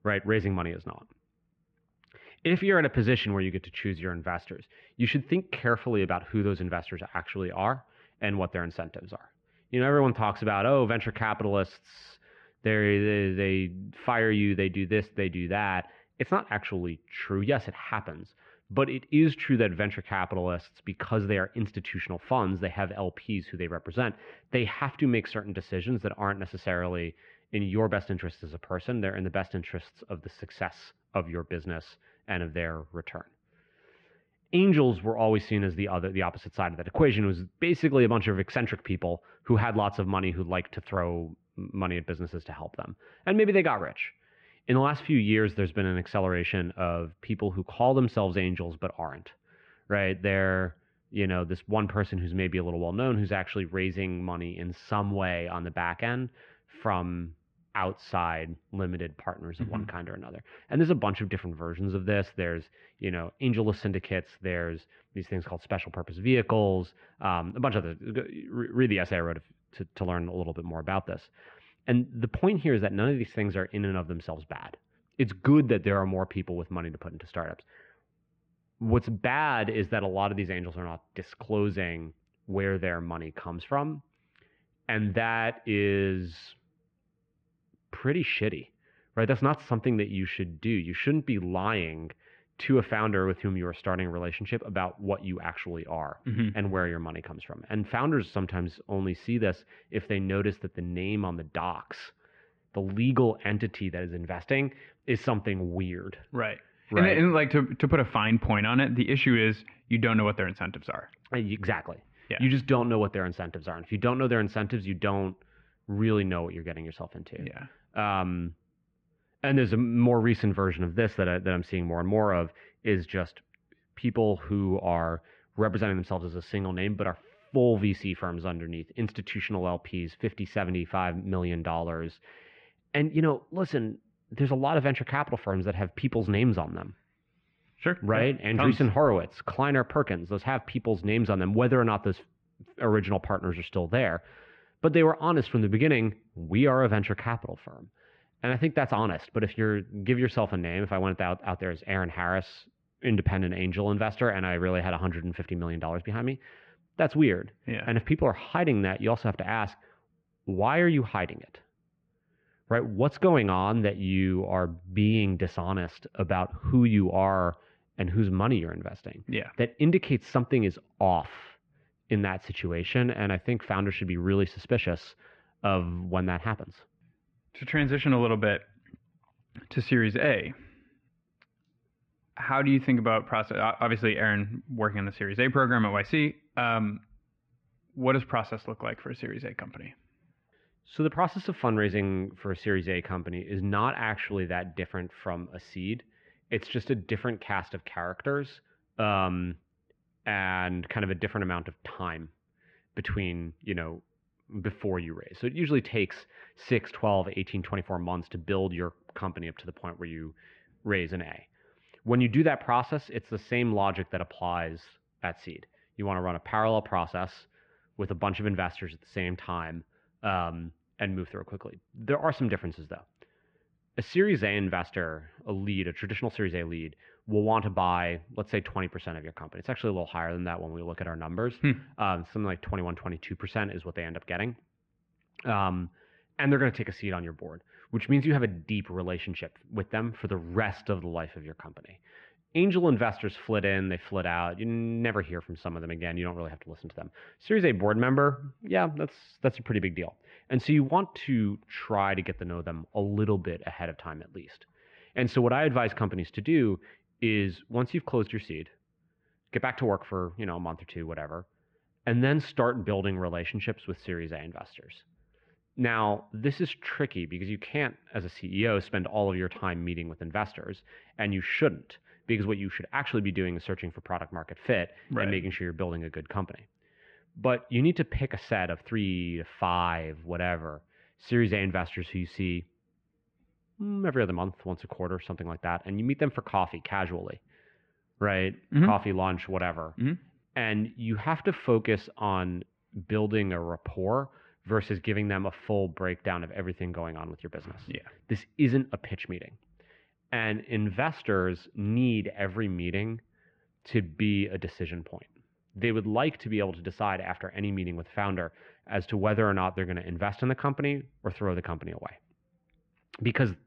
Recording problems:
muffled; very; fading above 2.5 kHz

